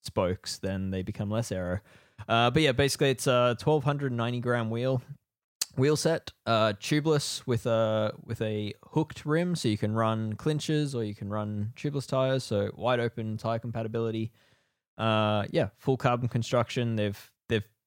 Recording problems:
none

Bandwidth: 16.5 kHz